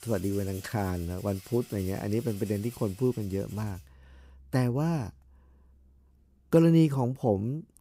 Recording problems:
background music; faint; throughout; 20 dB below the speech

